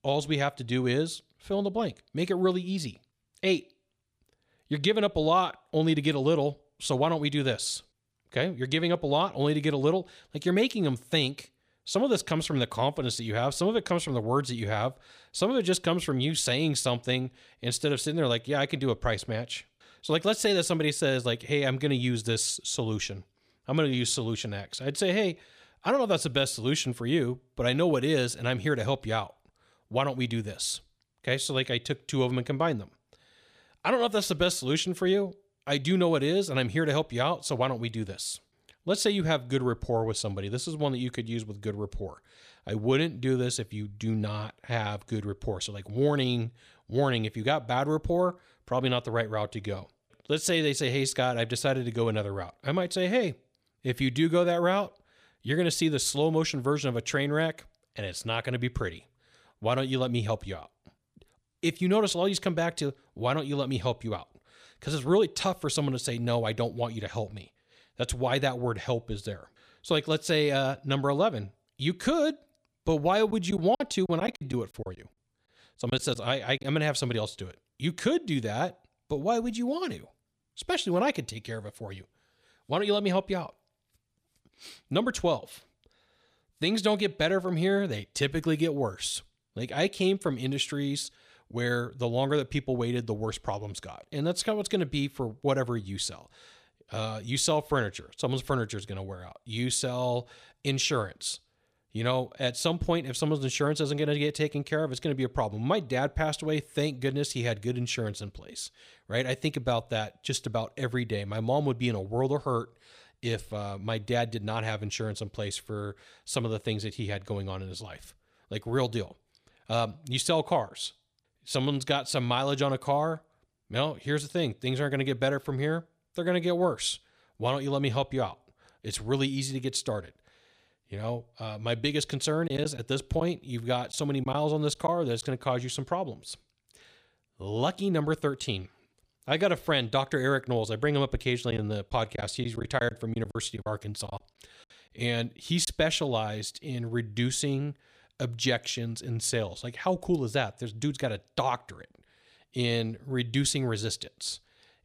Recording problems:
choppy; very; from 1:13 to 1:17, from 2:12 to 2:15 and from 2:22 to 2:26; 9% of the speech affected

